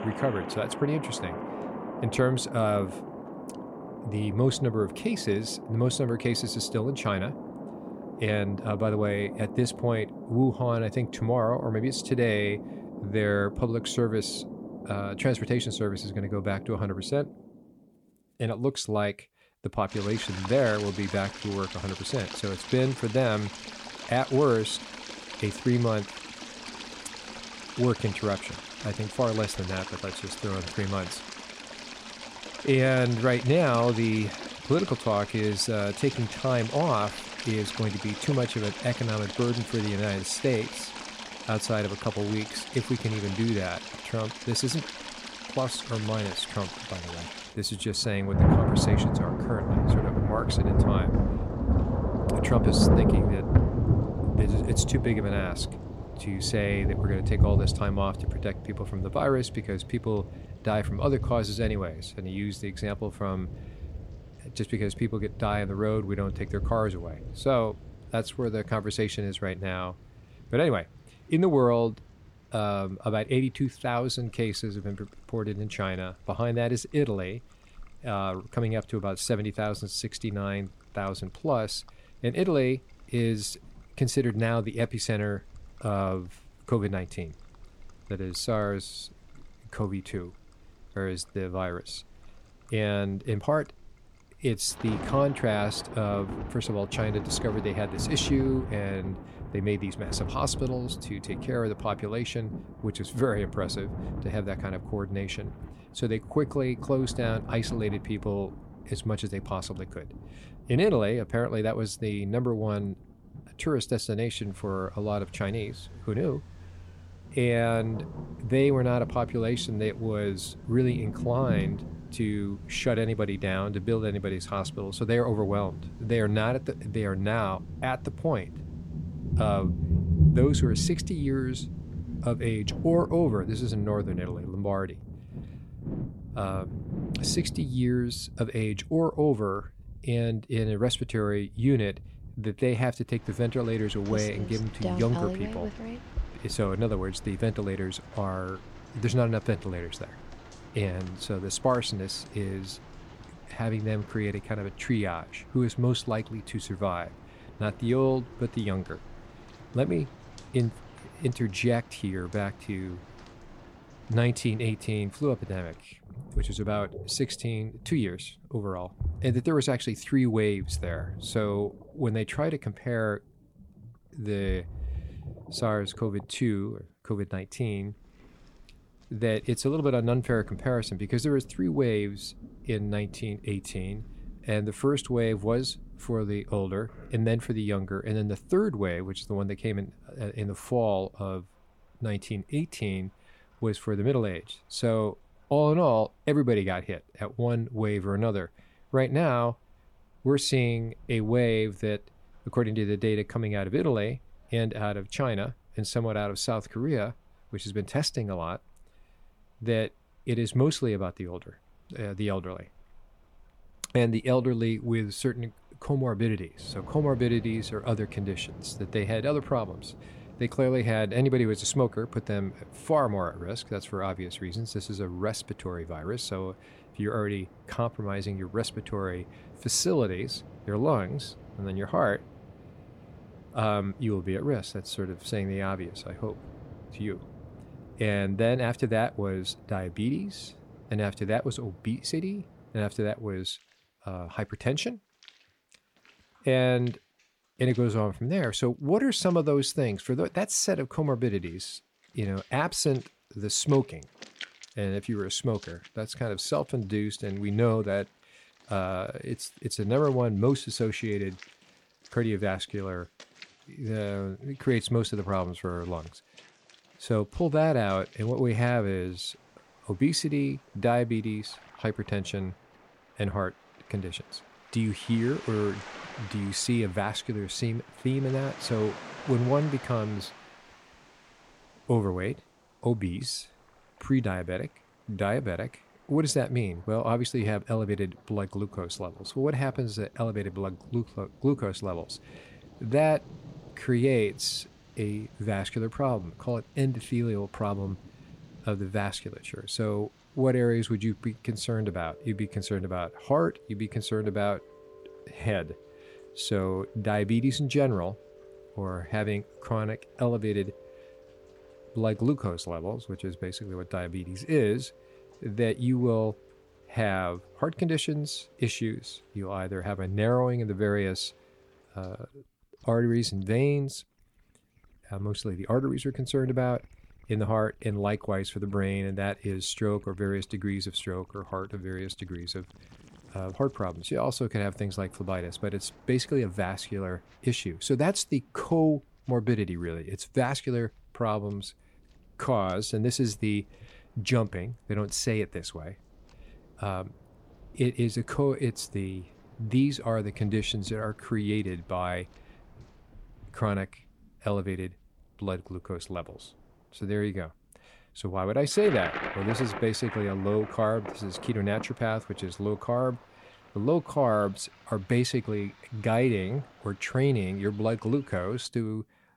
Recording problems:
rain or running water; loud; throughout; 6 dB below the speech

